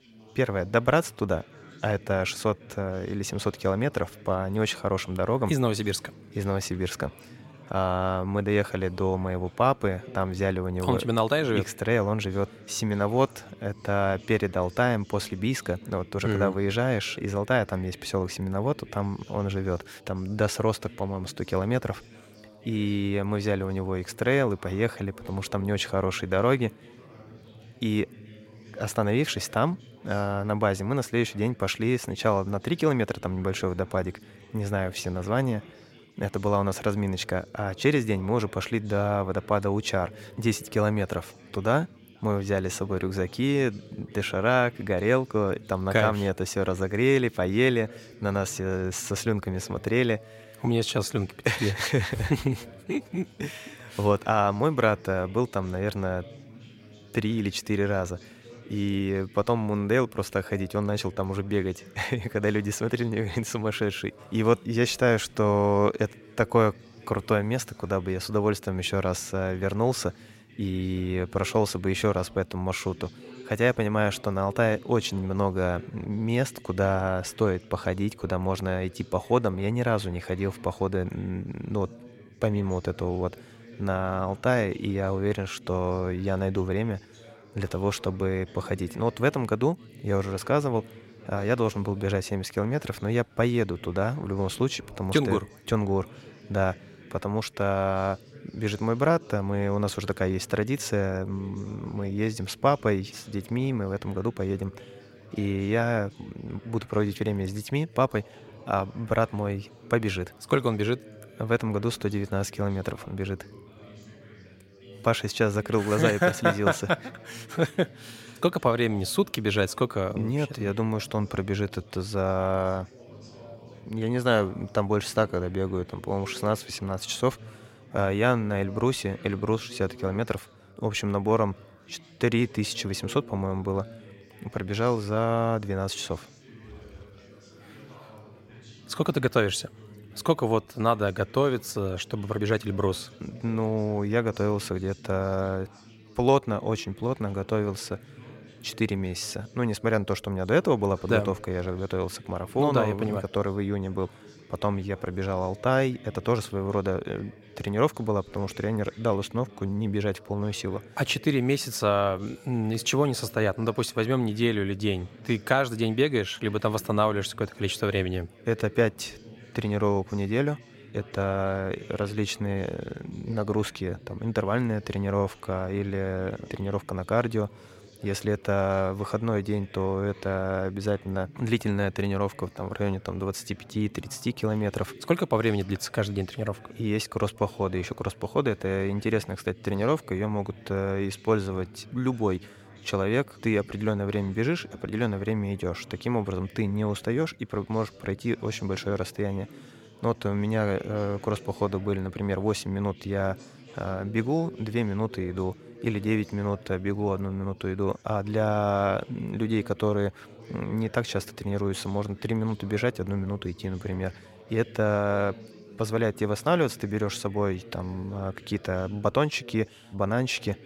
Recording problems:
chatter from many people; faint; throughout; 20 dB below the speech

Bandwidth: 16 kHz